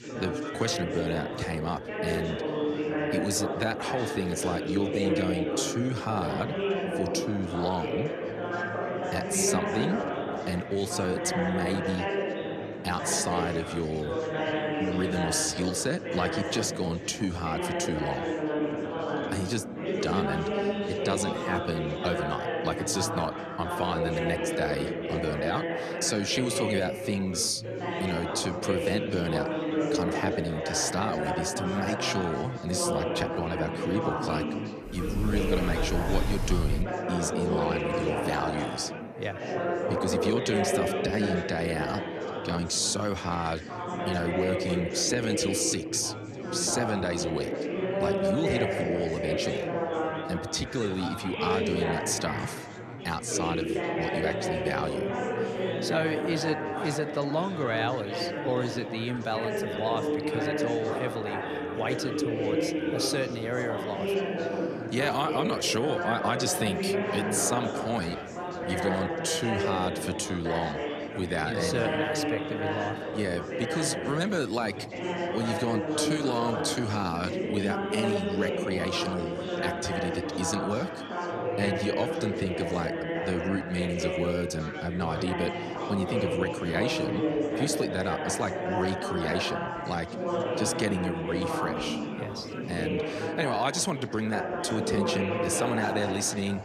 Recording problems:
chatter from many people; loud; throughout; as loud as the speech
door banging; loud; from 35 to 37 s; peak level with the speech

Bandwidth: 14 kHz